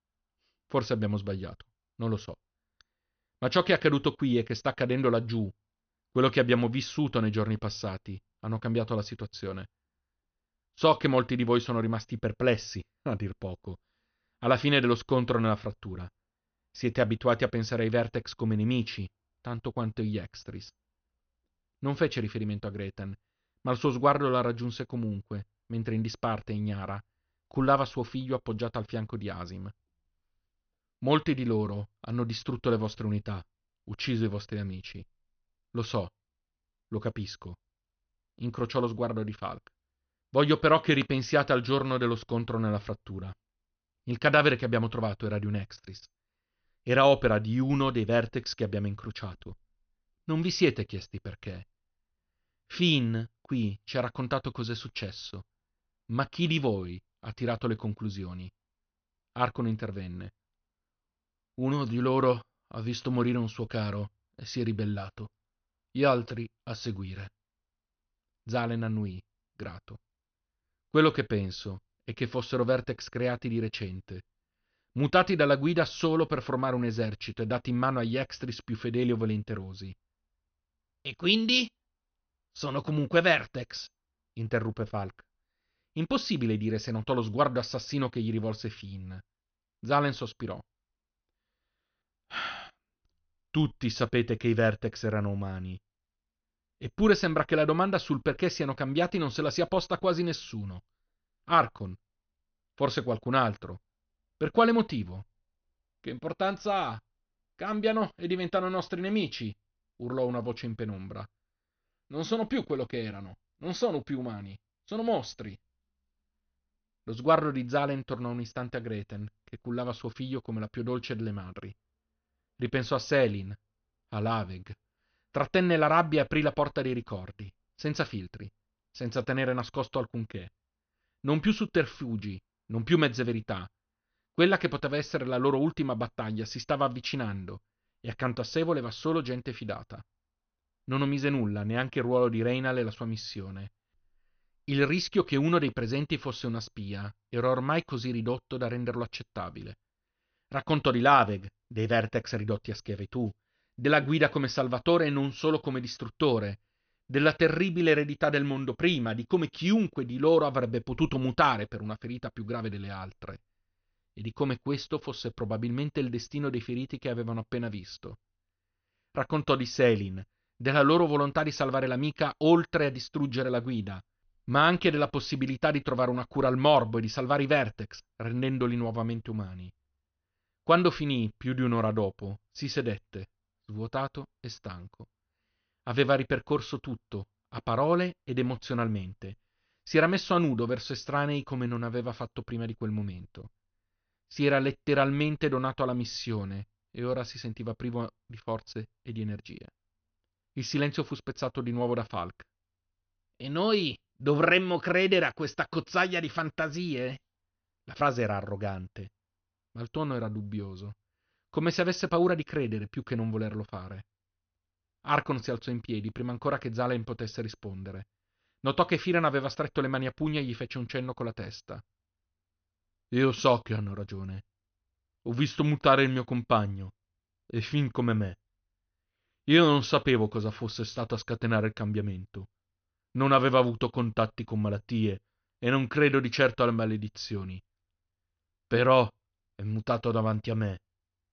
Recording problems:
high frequencies cut off; noticeable; nothing above 6 kHz

